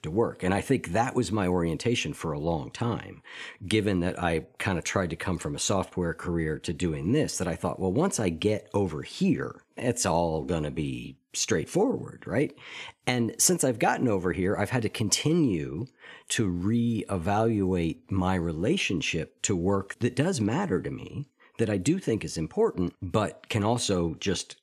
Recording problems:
none

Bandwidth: 14.5 kHz